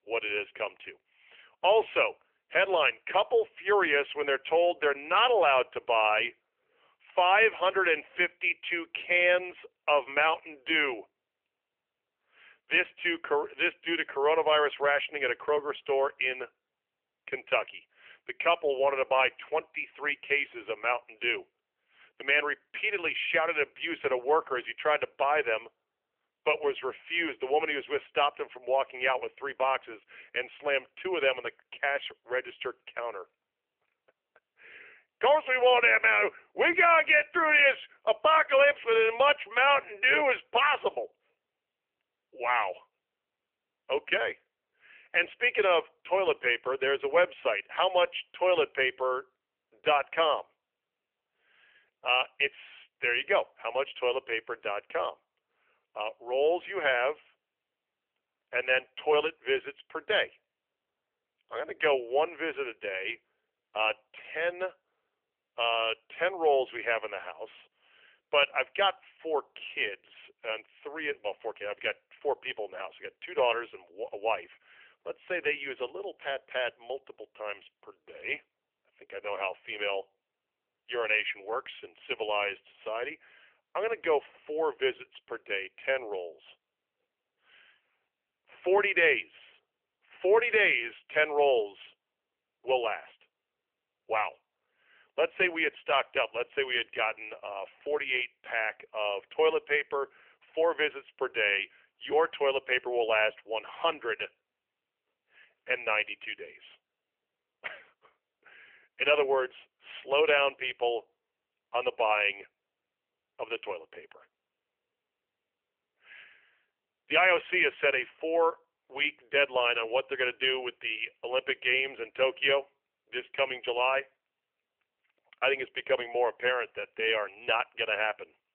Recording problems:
thin; very; fading below 350 Hz
phone-call audio; nothing above 3 kHz

